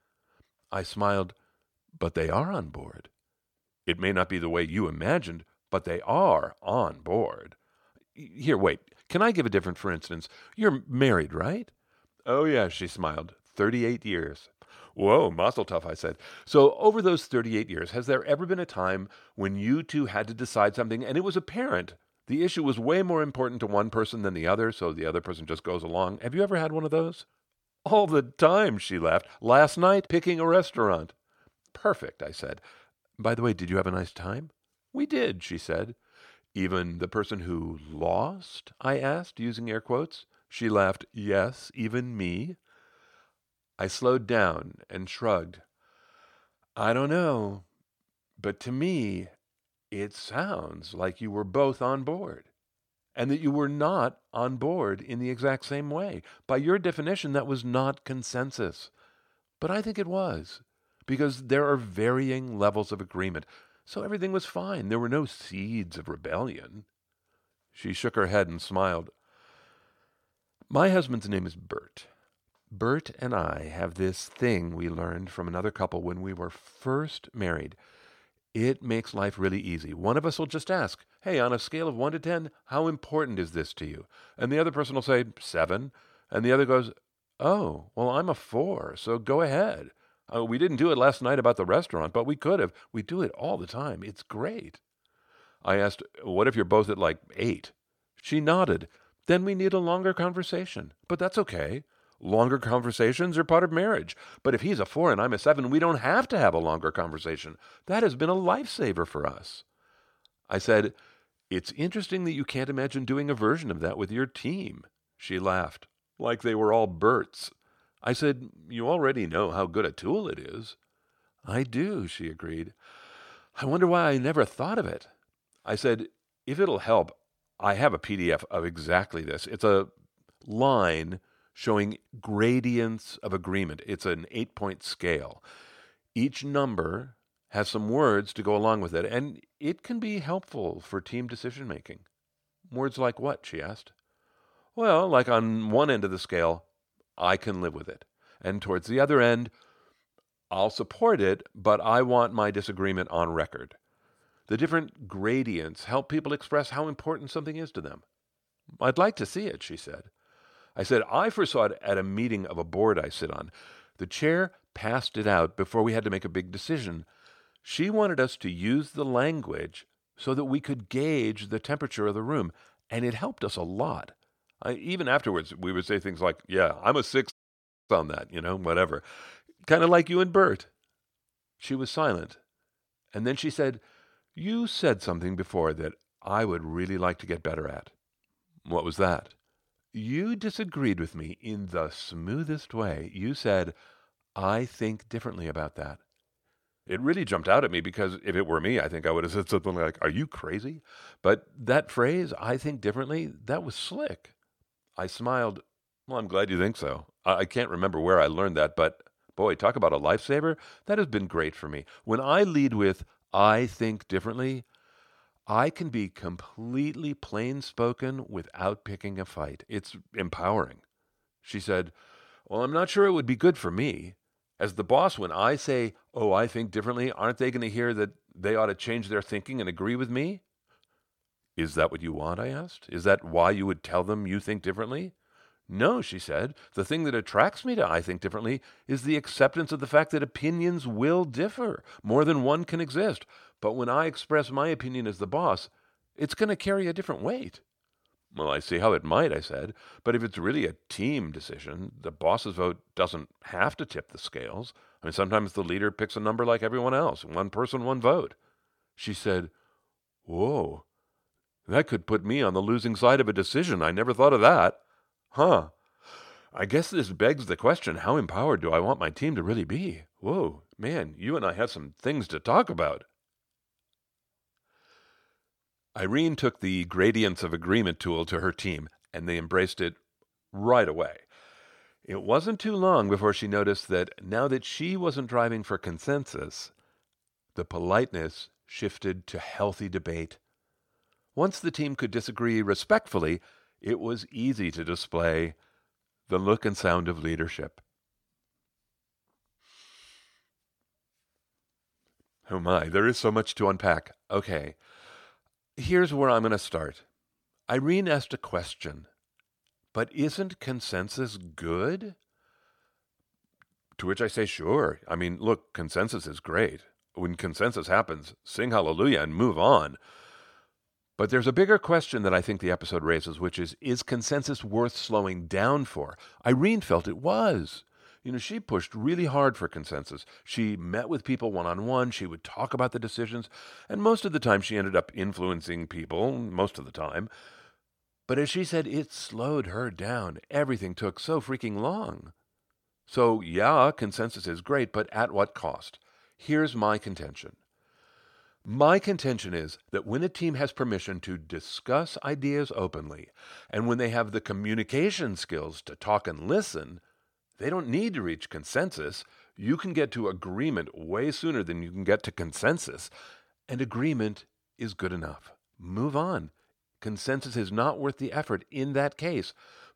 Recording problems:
audio cutting out; at 2:57 for 0.5 s

